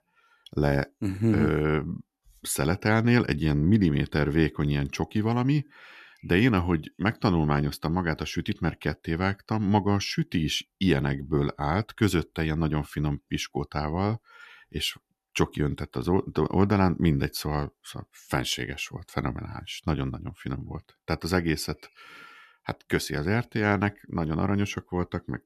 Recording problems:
none

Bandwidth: 14 kHz